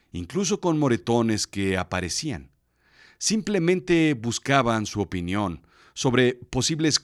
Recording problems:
none

